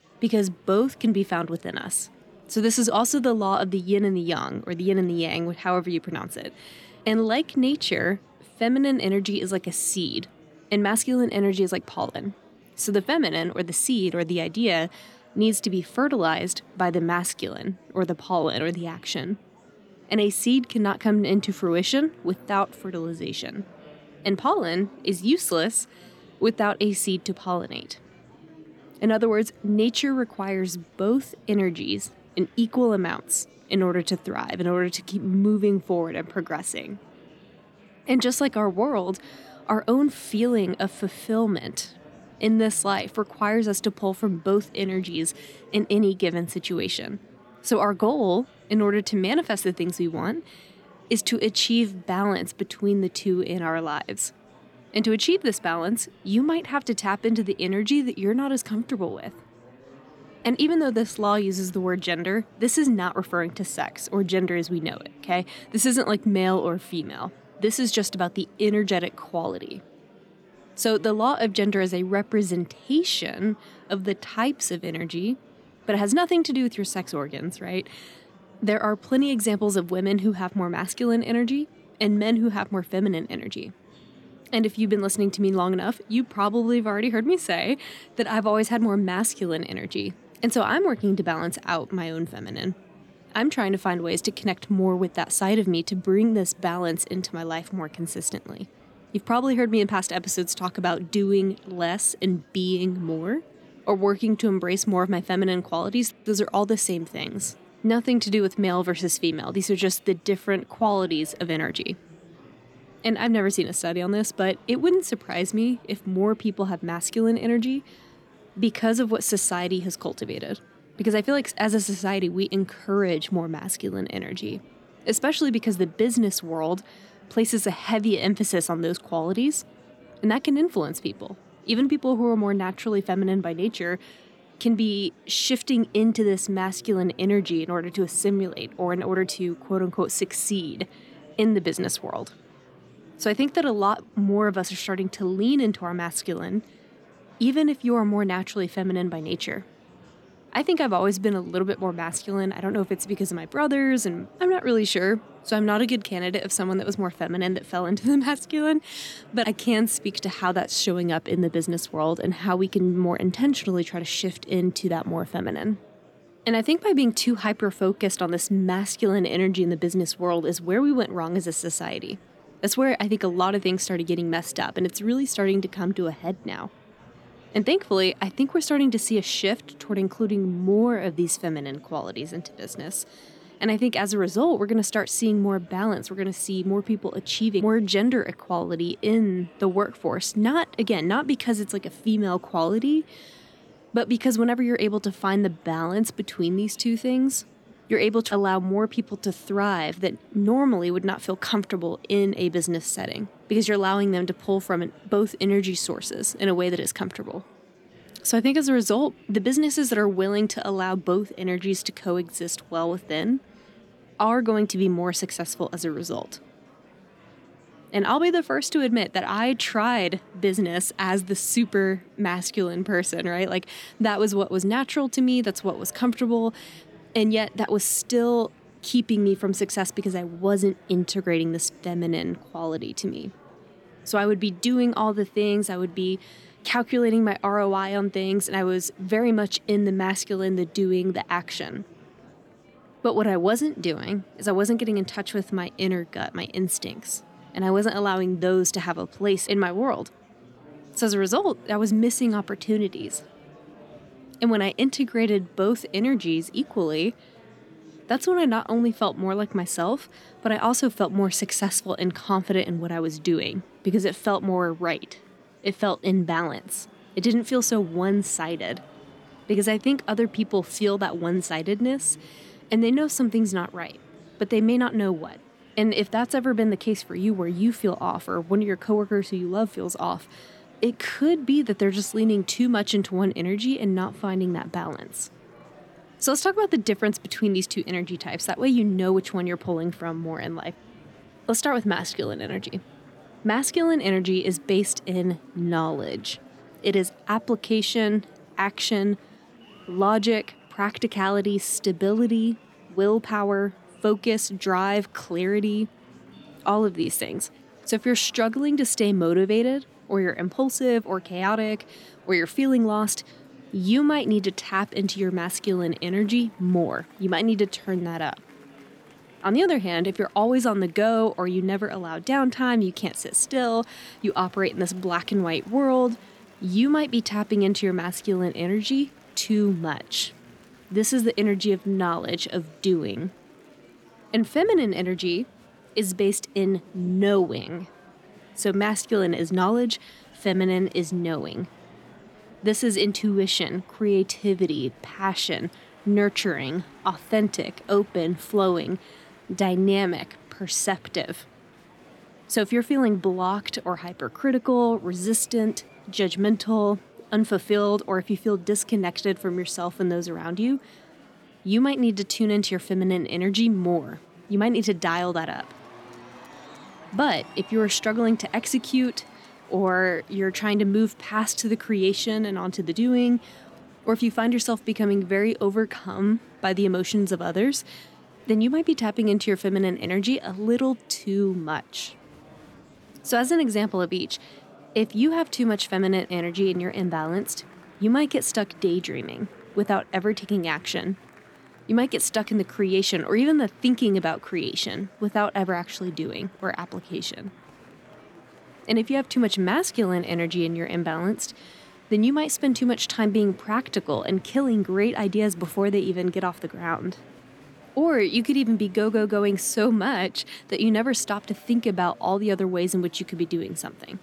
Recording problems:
murmuring crowd; faint; throughout; 25 dB below the speech

